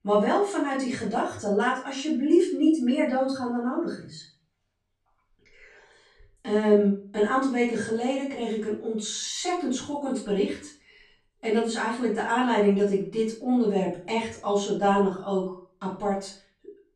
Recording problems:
off-mic speech; far
room echo; slight; dies away in 0.4 s

